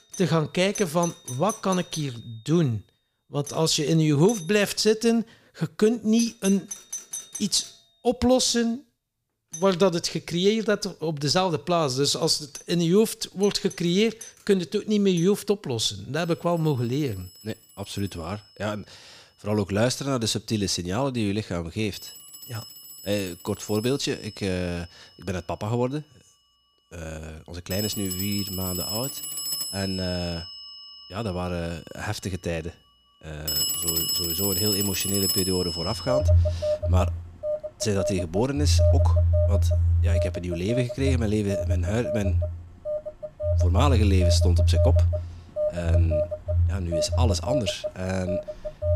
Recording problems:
alarms or sirens; loud; throughout; as loud as the speech

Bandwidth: 15 kHz